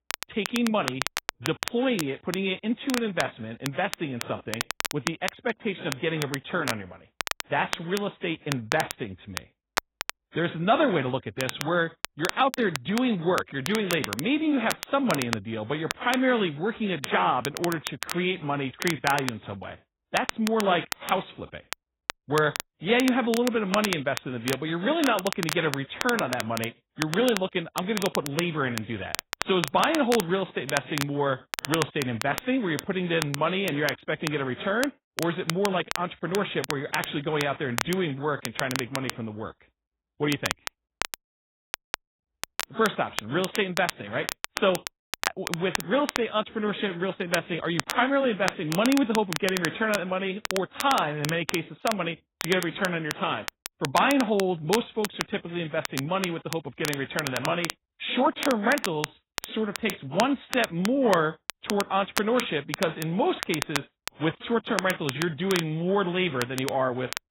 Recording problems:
garbled, watery; badly; nothing above 4 kHz
crackle, like an old record; loud; 7 dB below the speech

